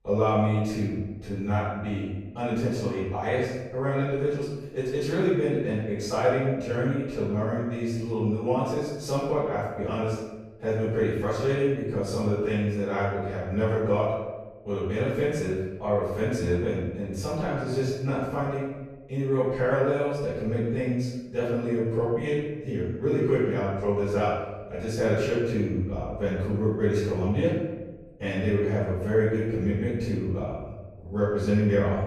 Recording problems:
room echo; strong; dies away in 1 s
off-mic speech; far

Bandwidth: 14.5 kHz